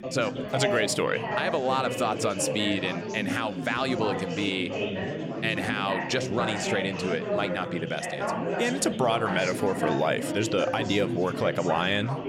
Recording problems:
chatter from many people; loud; throughout; 4 dB below the speech

